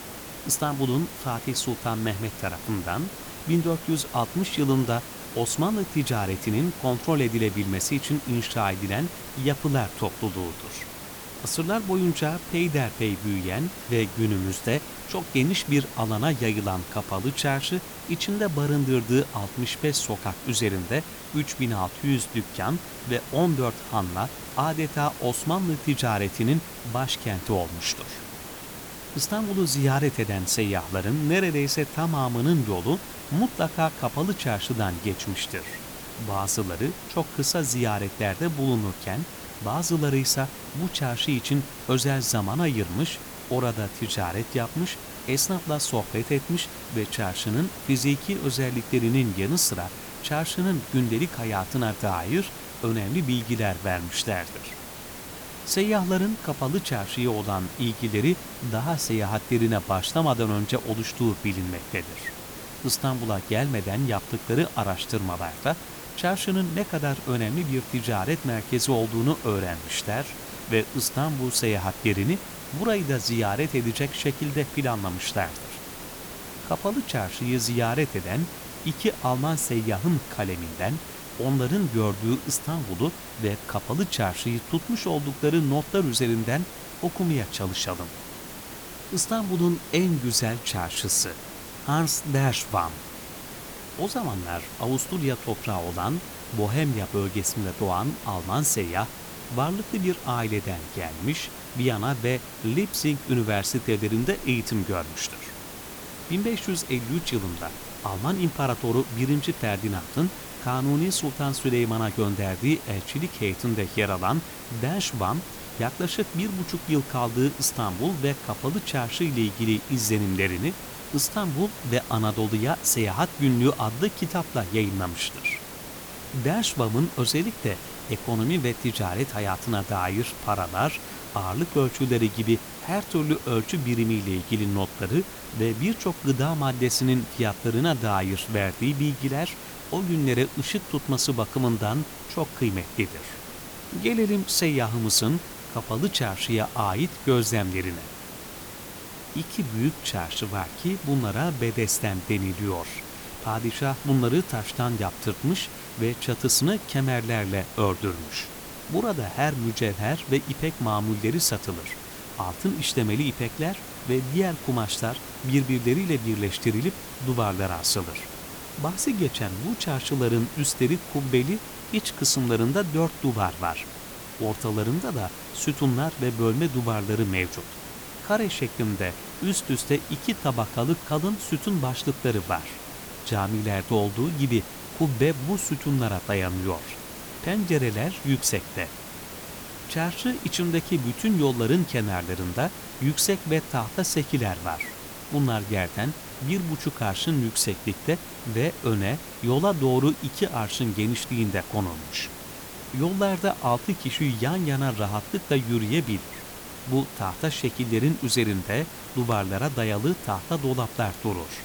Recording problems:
hiss; noticeable; throughout; 10 dB below the speech

